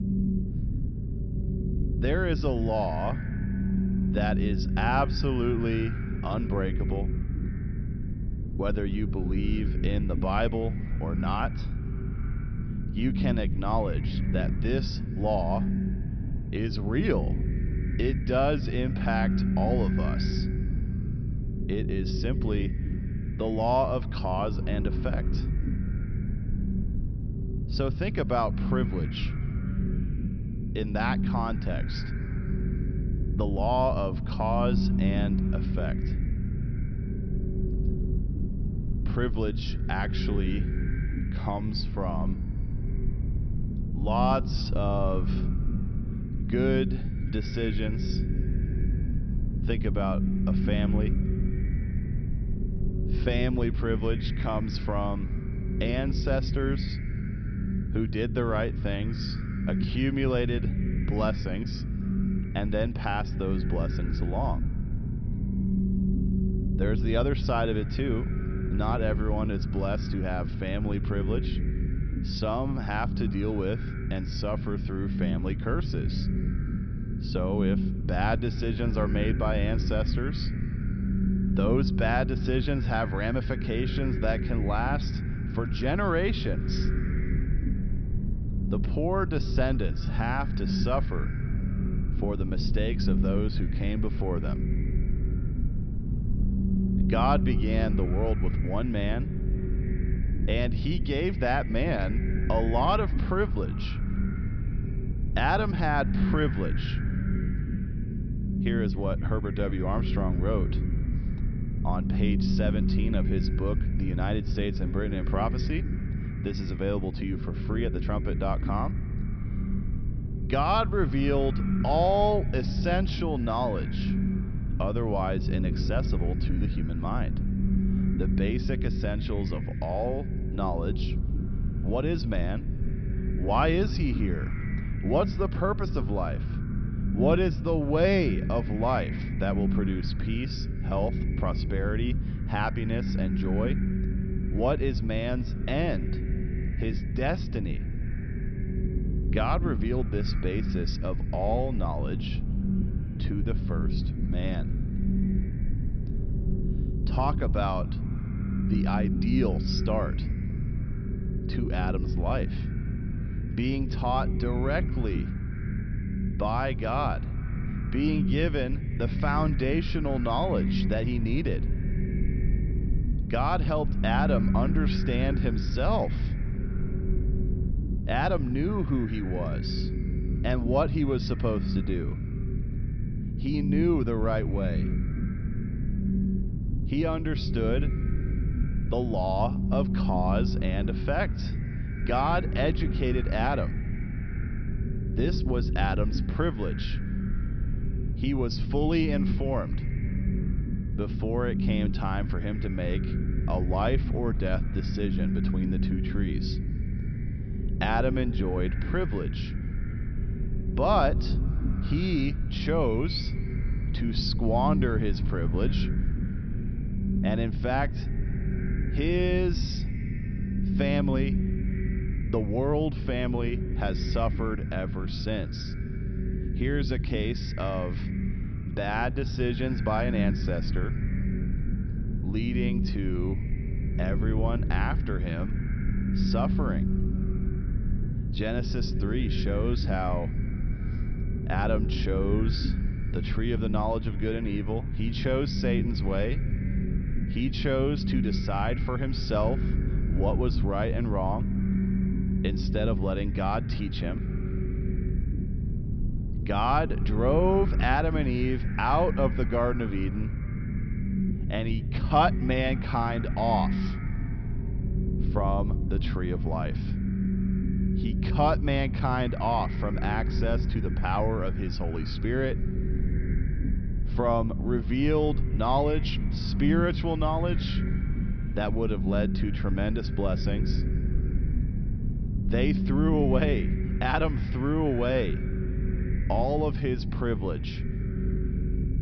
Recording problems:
high frequencies cut off; noticeable; nothing above 5.5 kHz
echo of what is said; faint; throughout; 260 ms later, 20 dB below the speech
low rumble; loud; throughout; 9 dB below the speech

